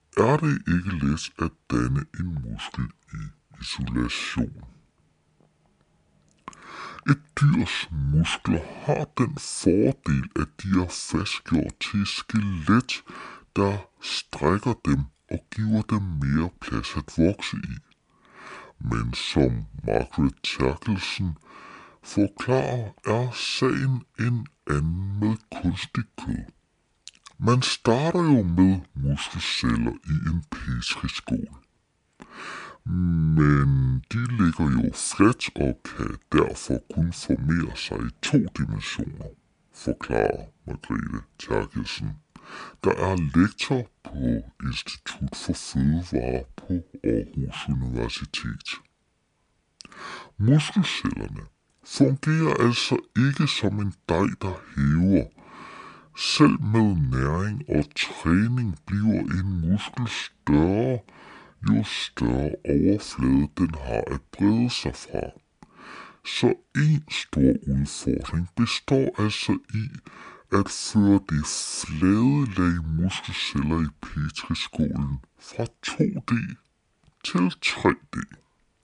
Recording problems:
wrong speed and pitch; too slow and too low; 0.6 times normal speed

